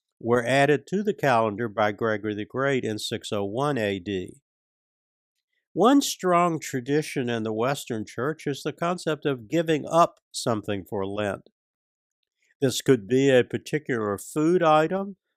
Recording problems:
none

